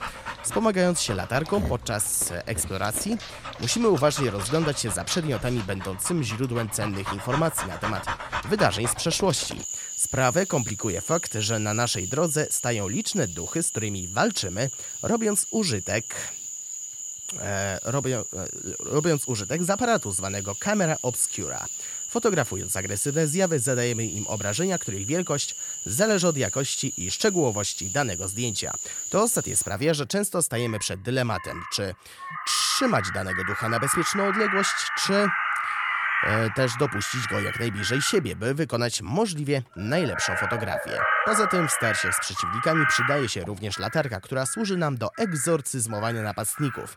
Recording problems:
animal sounds; loud; throughout; 4 dB below the speech

